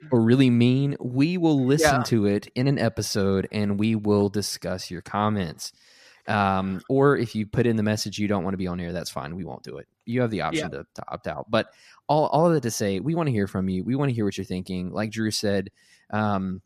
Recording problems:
none

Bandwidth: 14.5 kHz